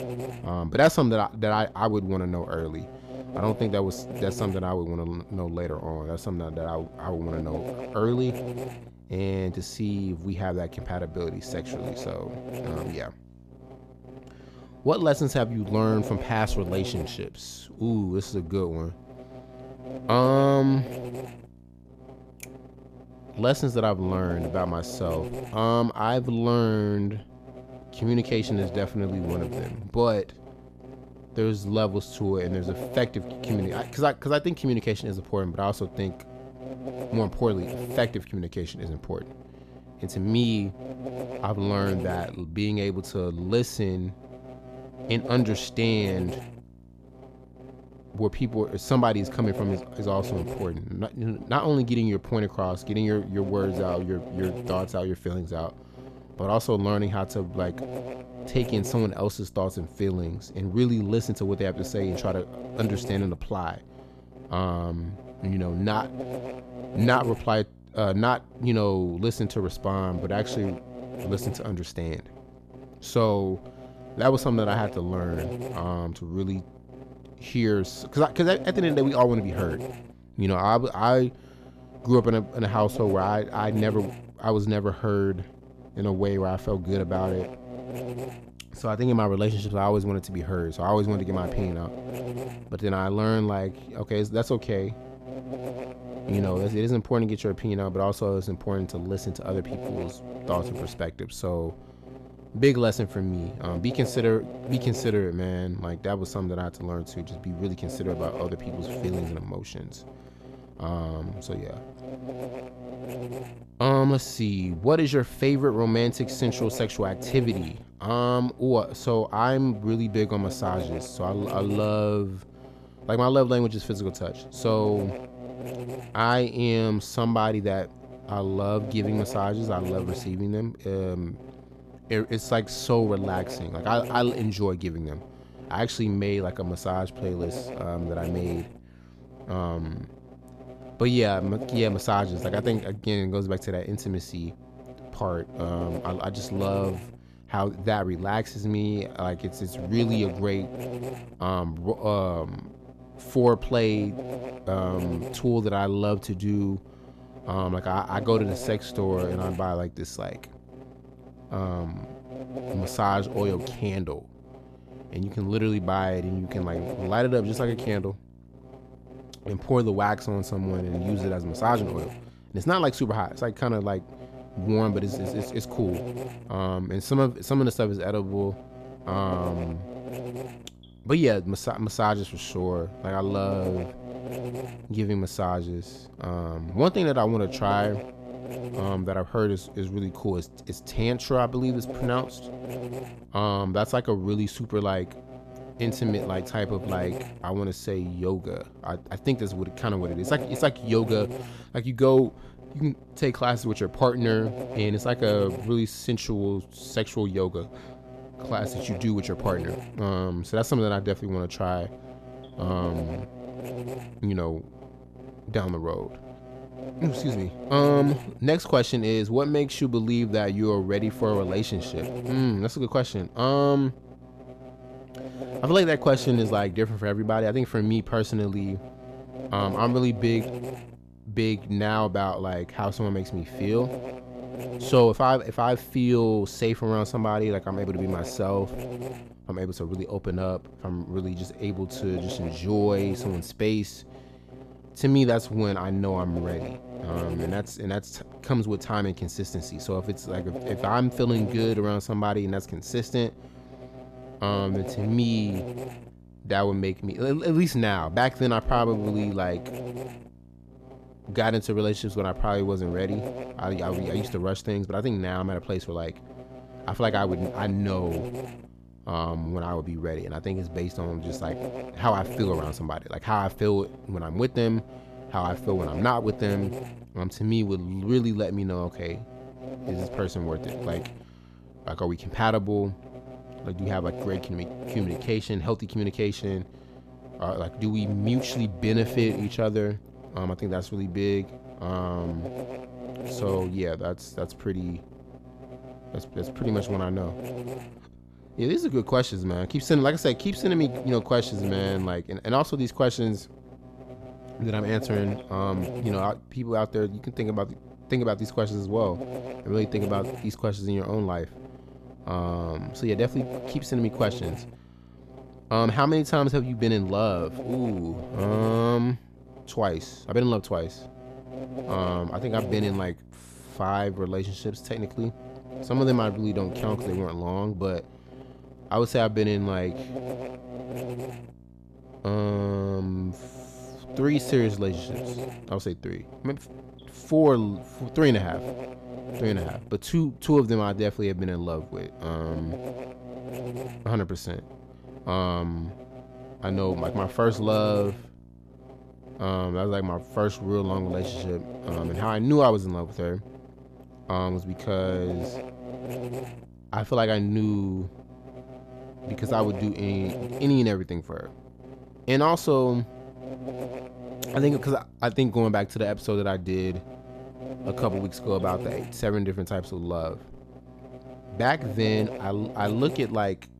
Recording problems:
electrical hum; noticeable; throughout; 60 Hz, 10 dB below the speech

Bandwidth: 14.5 kHz